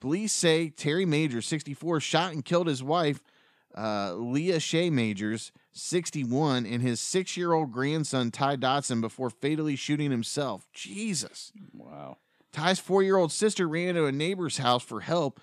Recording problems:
none

